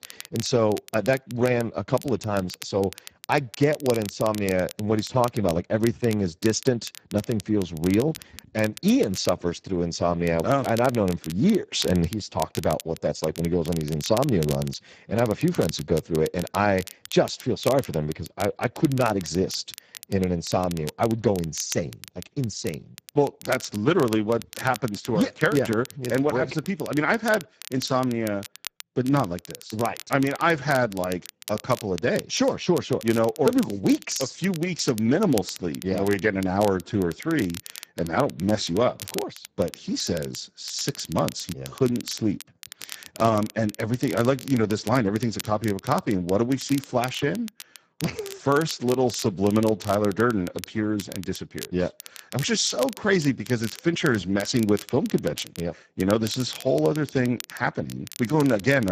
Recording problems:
garbled, watery; badly; nothing above 7.5 kHz
crackle, like an old record; noticeable; 15 dB below the speech
abrupt cut into speech; at the end

